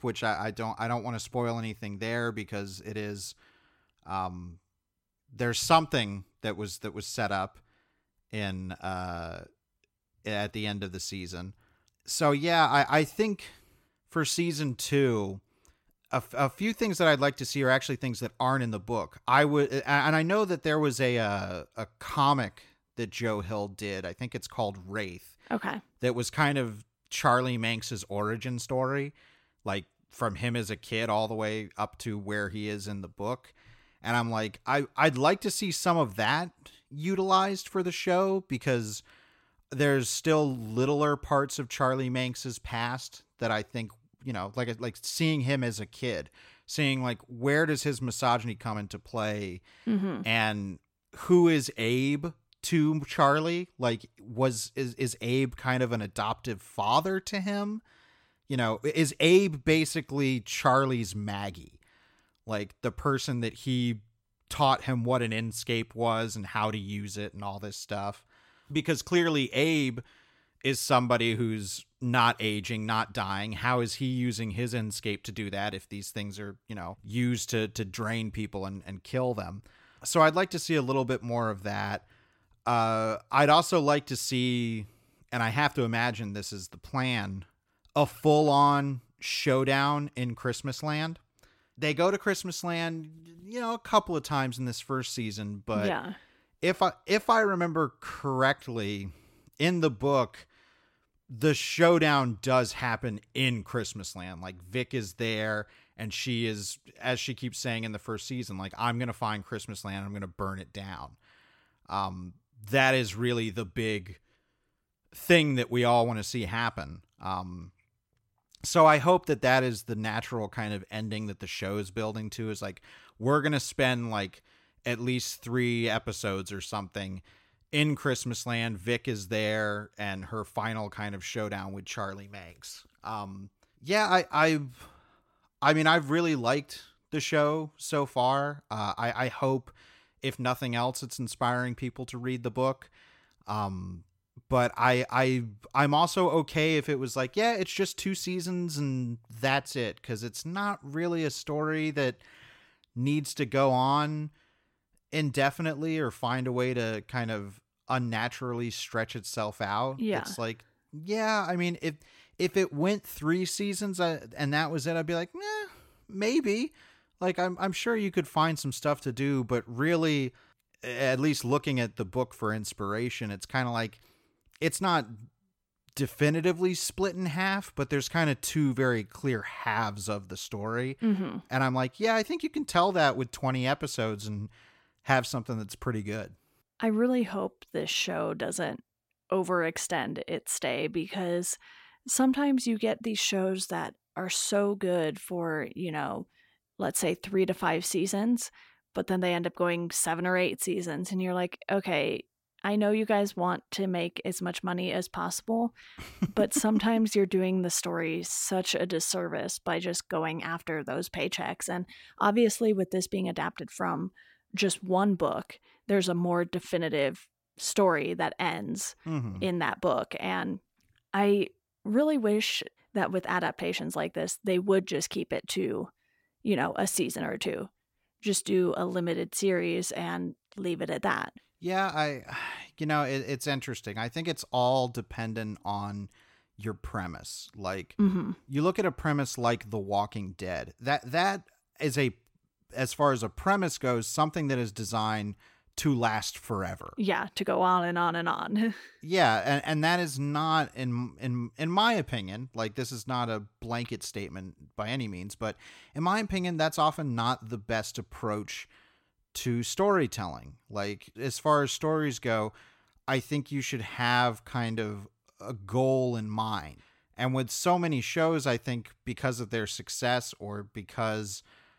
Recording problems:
none

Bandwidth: 16.5 kHz